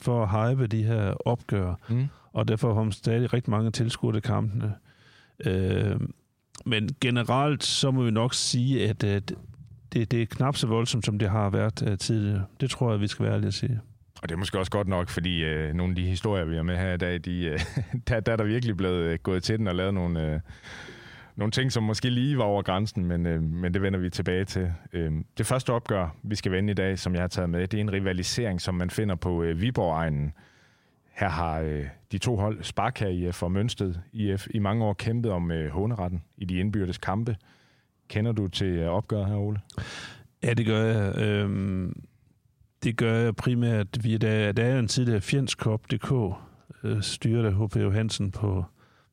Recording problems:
squashed, flat; heavily

